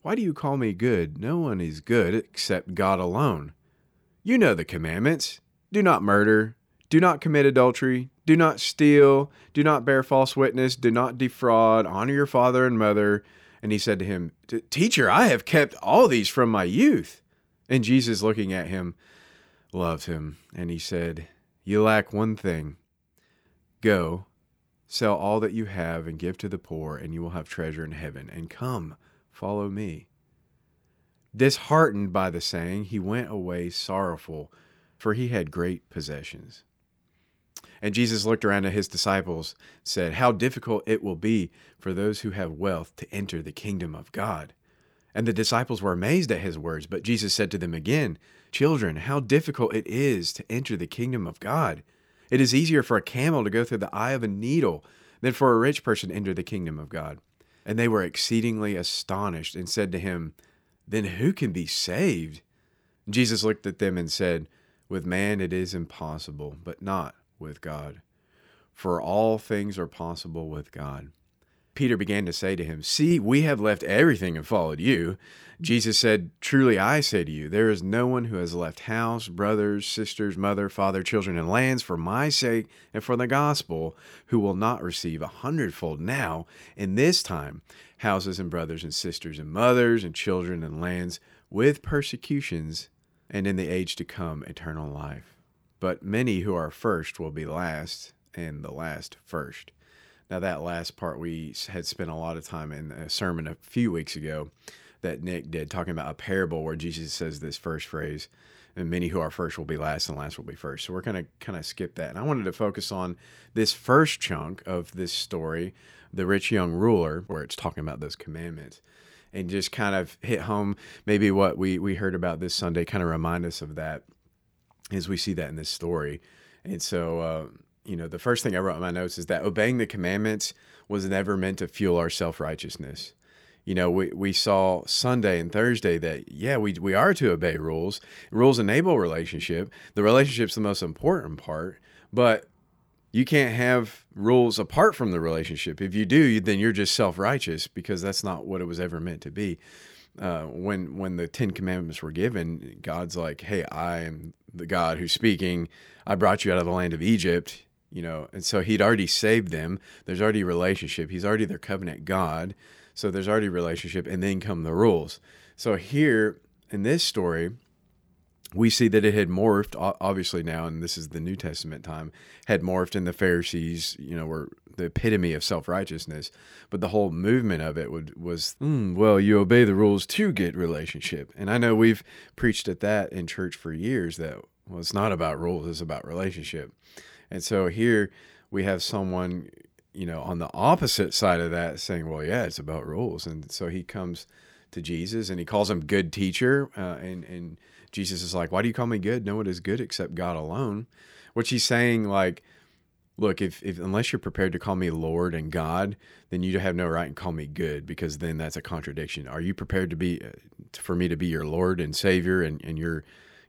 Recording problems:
none

